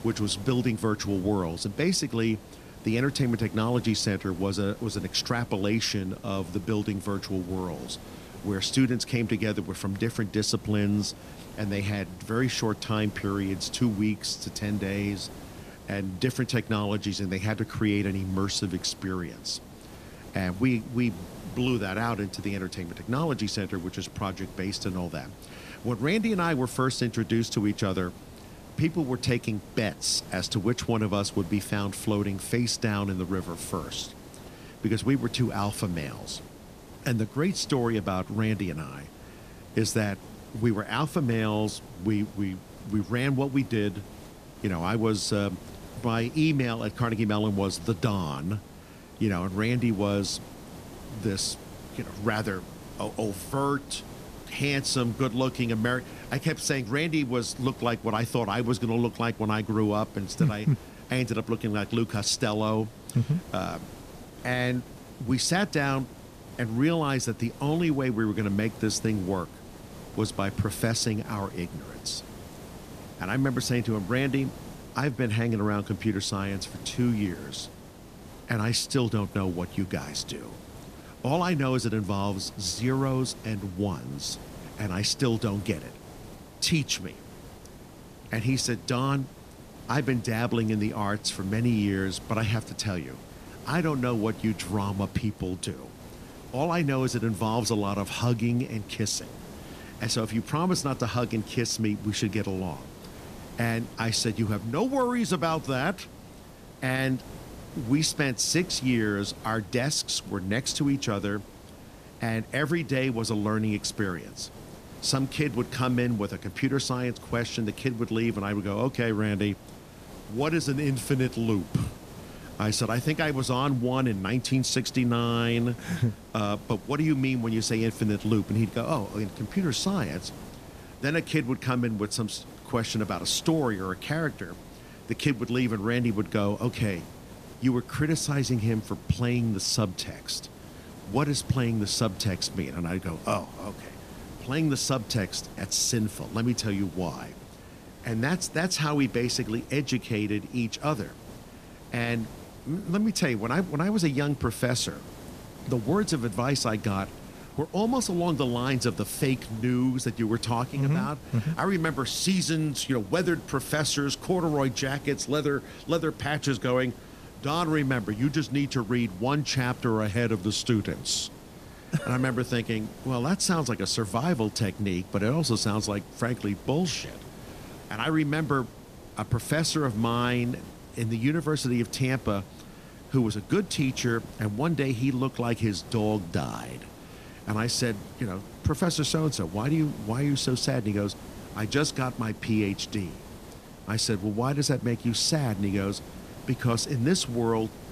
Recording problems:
hiss; noticeable; throughout; 15 dB below the speech

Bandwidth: 14.5 kHz